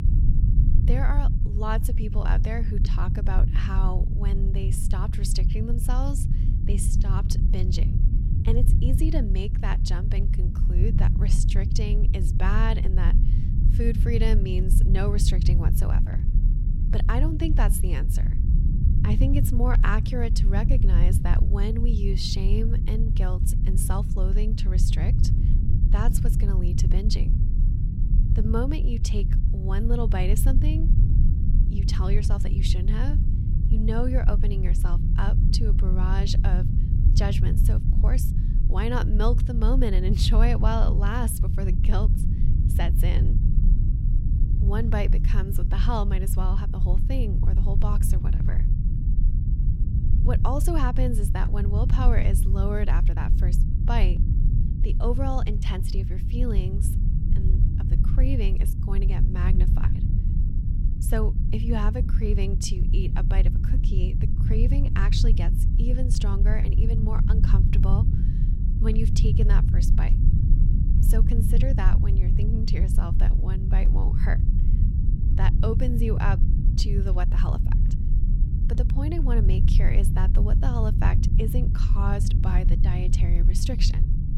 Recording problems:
low rumble; loud; throughout; 5 dB below the speech

